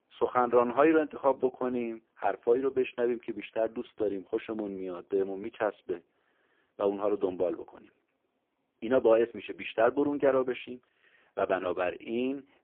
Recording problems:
phone-call audio; poor line; nothing above 3.5 kHz

